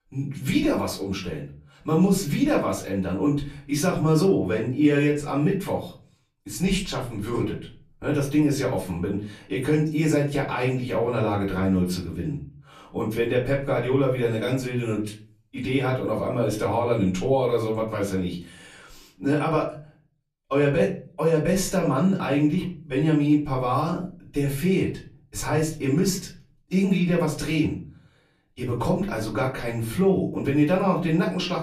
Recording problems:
off-mic speech; far
room echo; slight; dies away in 0.4 s

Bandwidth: 14.5 kHz